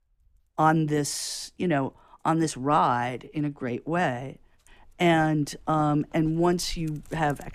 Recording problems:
animal sounds; faint; throughout; 25 dB below the speech

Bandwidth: 14.5 kHz